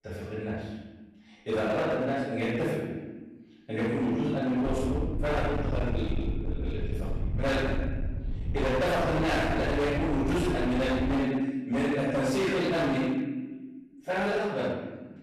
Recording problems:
distortion; heavy; 22% of the sound clipped
room echo; strong; dies away in 1.1 s
off-mic speech; far
low rumble; noticeable; from 4.5 to 11 s; 10 dB below the speech

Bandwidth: 14 kHz